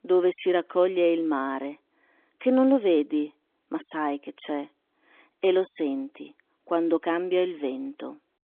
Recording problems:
phone-call audio; nothing above 3.5 kHz

